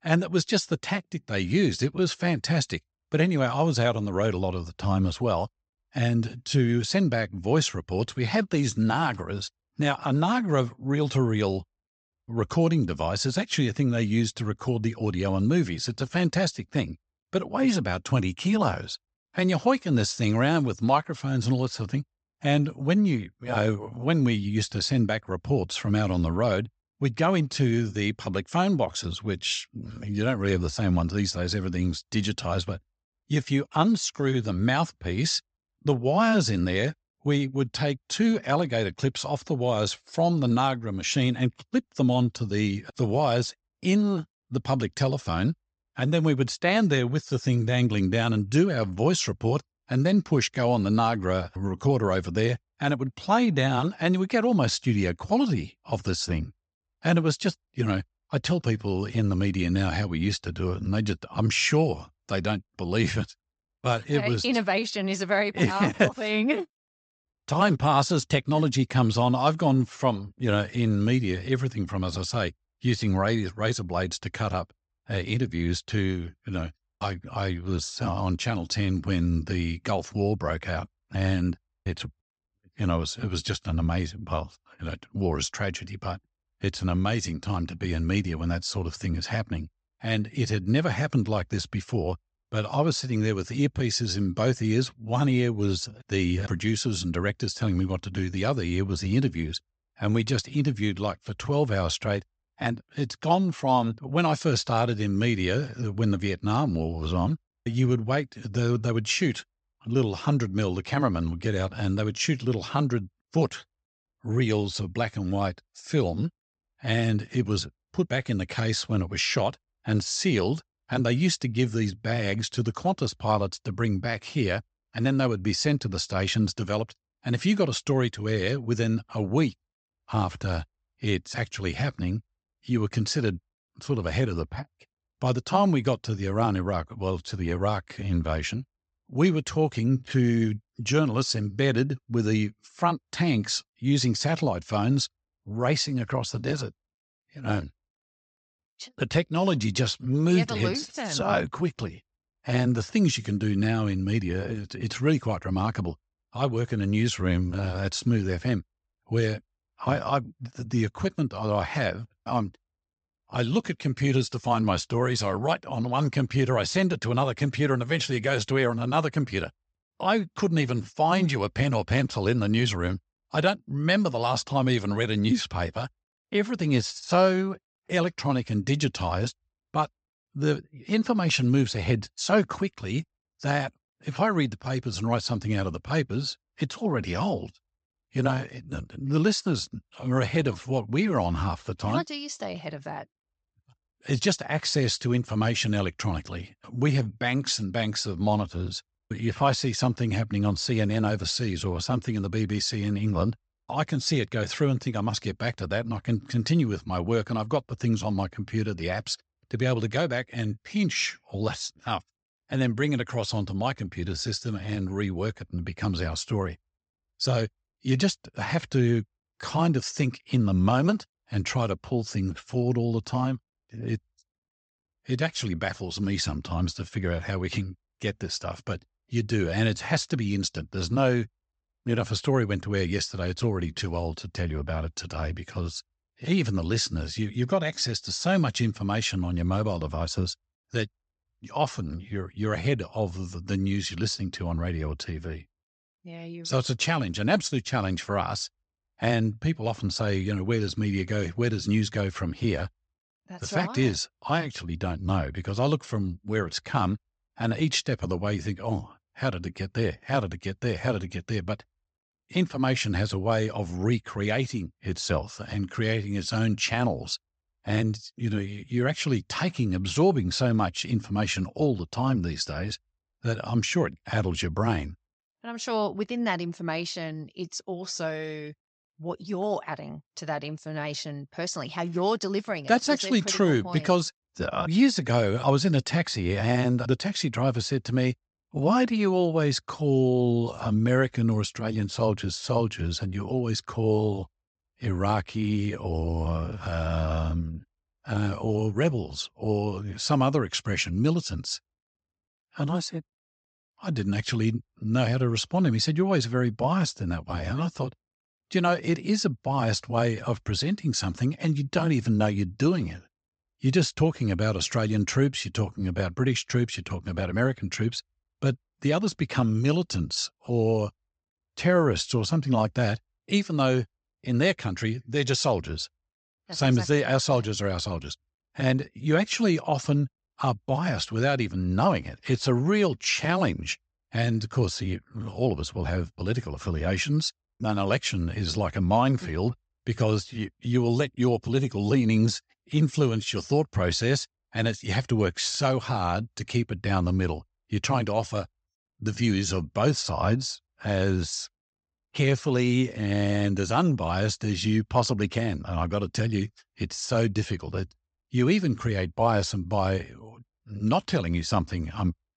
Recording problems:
high frequencies cut off; noticeable; nothing above 8 kHz

